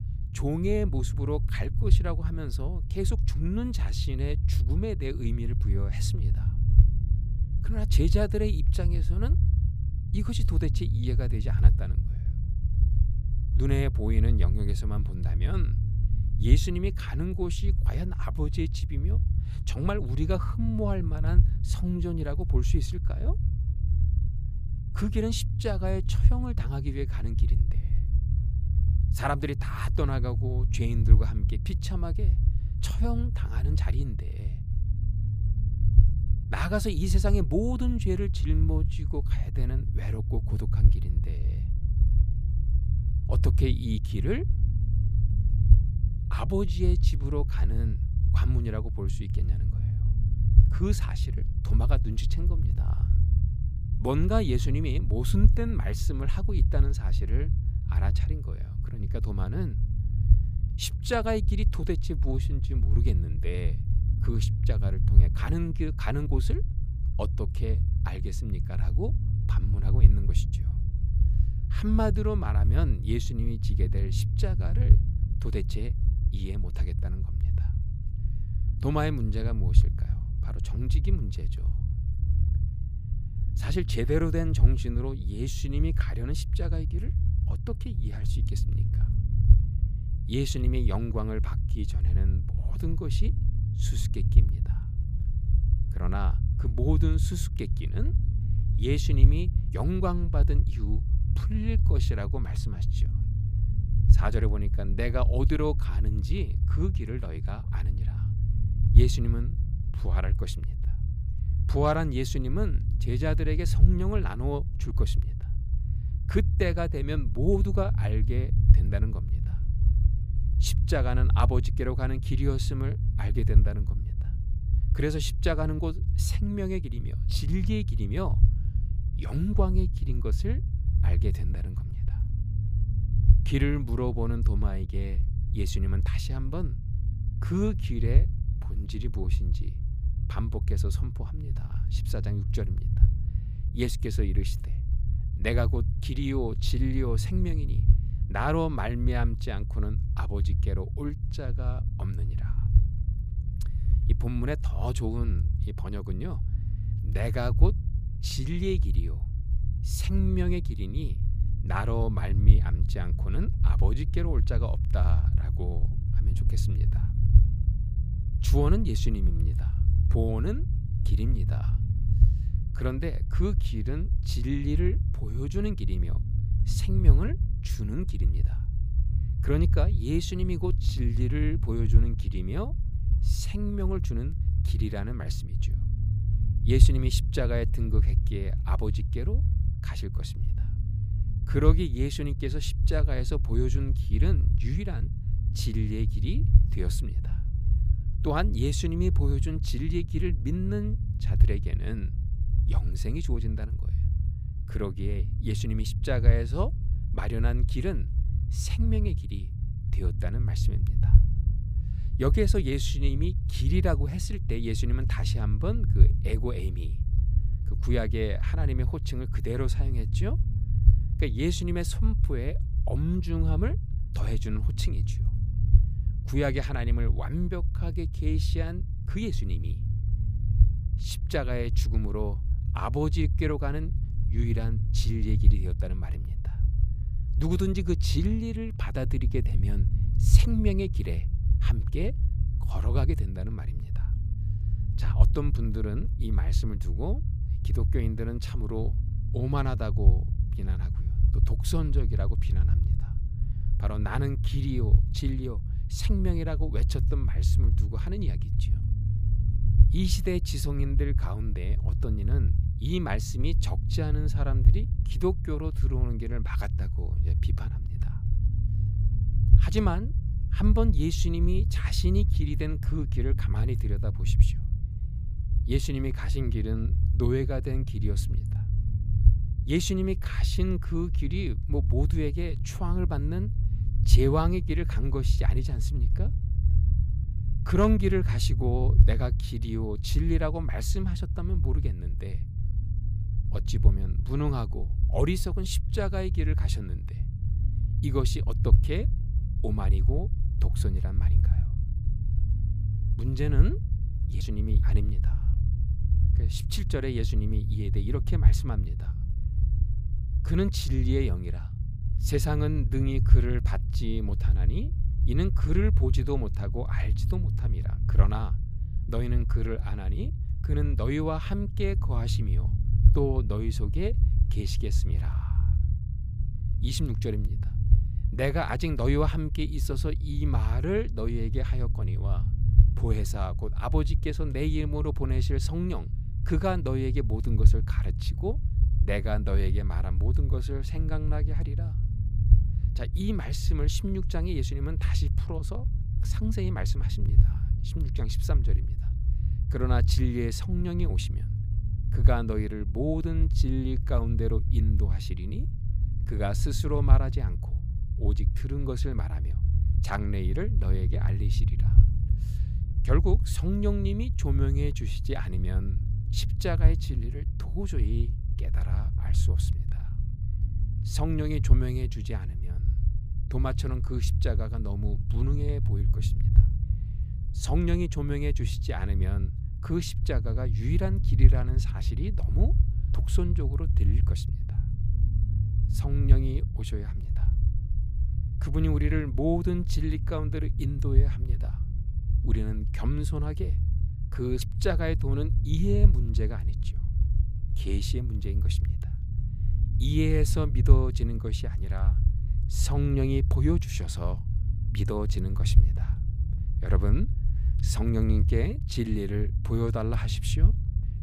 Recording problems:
low rumble; loud; throughout; 8 dB below the speech

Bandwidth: 15 kHz